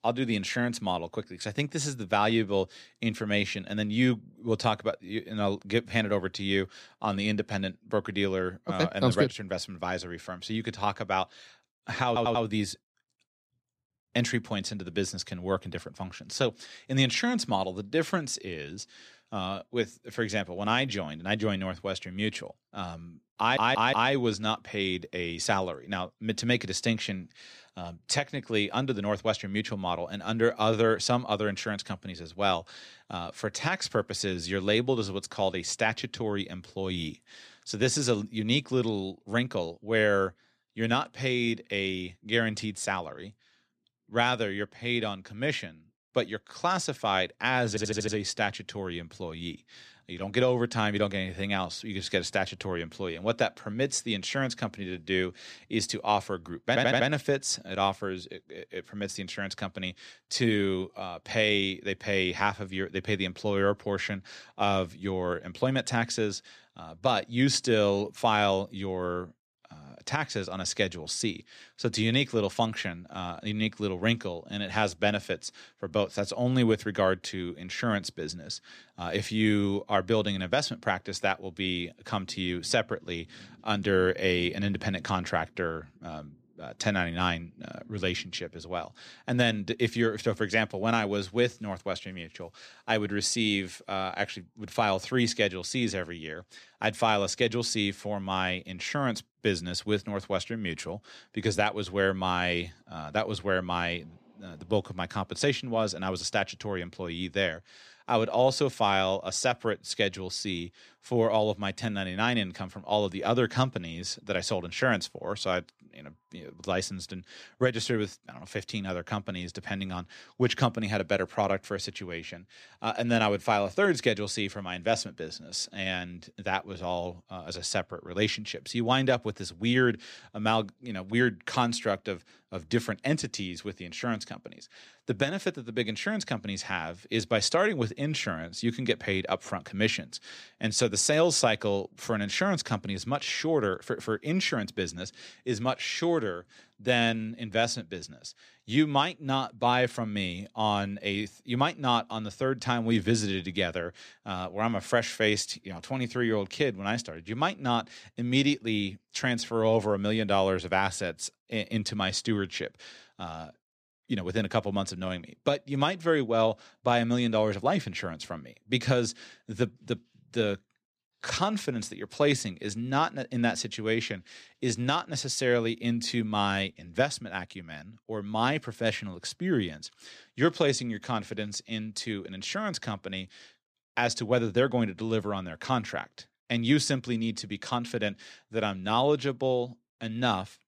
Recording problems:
audio stuttering; 4 times, first at 12 s

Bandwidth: 14.5 kHz